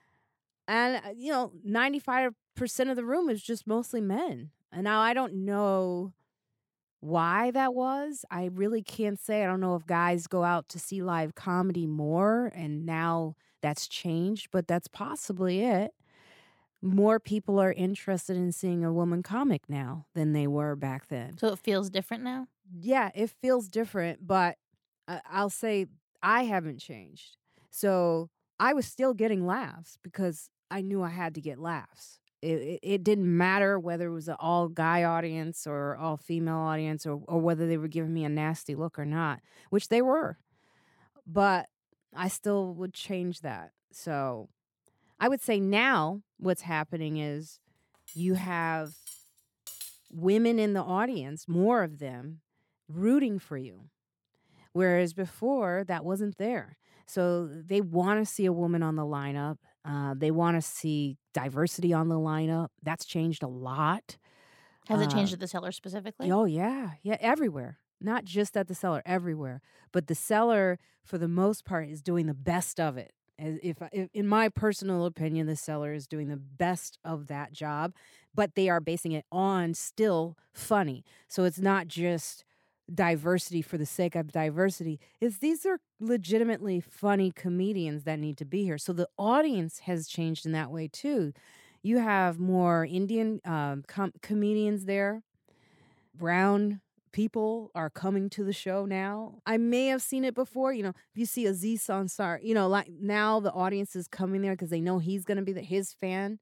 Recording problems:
uneven, jittery; strongly; from 14 s to 1:44
clattering dishes; faint; from 48 to 50 s; peak 10 dB below the speech

